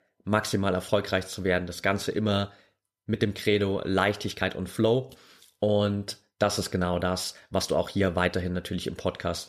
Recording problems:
uneven, jittery; slightly; from 3 to 8 s

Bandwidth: 14.5 kHz